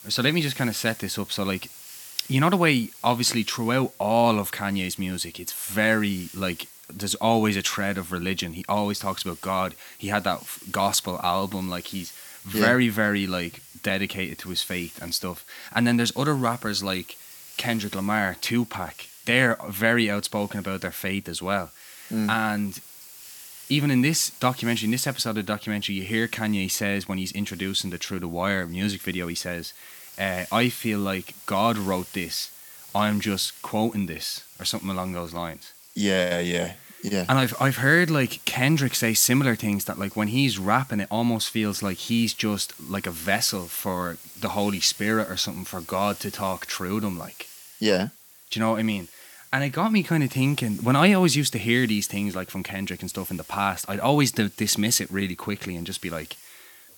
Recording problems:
hiss; noticeable; throughout; 20 dB below the speech

